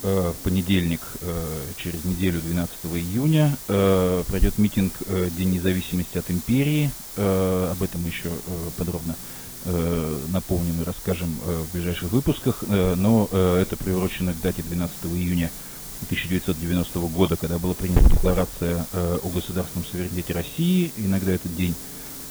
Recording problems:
garbled, watery; badly; nothing above 4 kHz
hiss; loud; throughout; 8 dB below the speech

